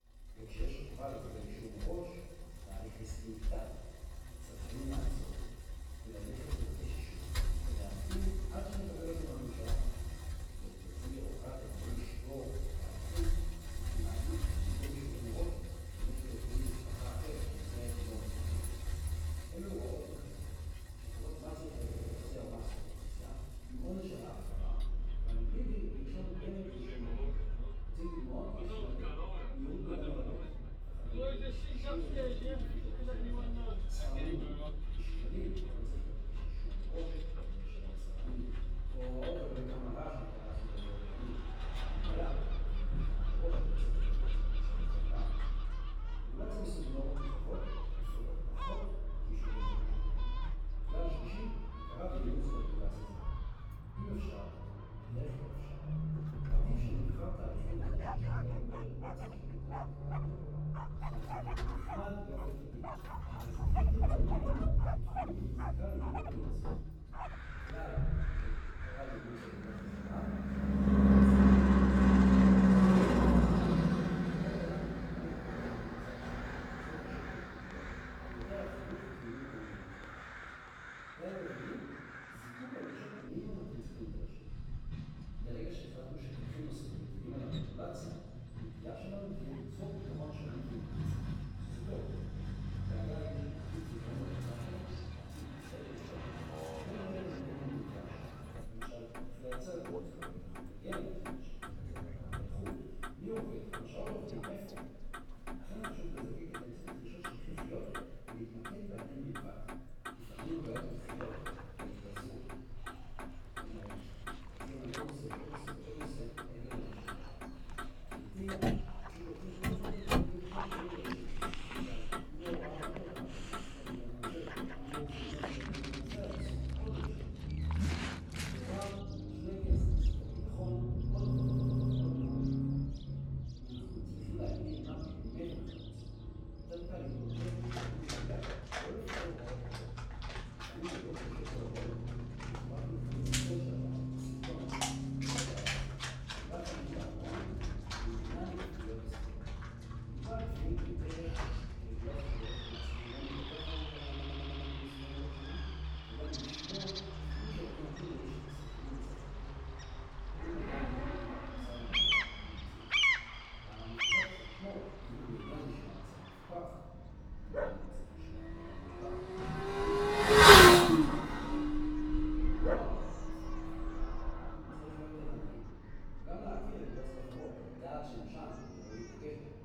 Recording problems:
room echo; strong; dies away in 1.5 s
off-mic speech; far
traffic noise; very loud; throughout; 15 dB above the speech
animal sounds; very loud; from 39 s on; 4 dB above the speech
audio stuttering; 4 times, first at 22 s

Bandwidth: 18.5 kHz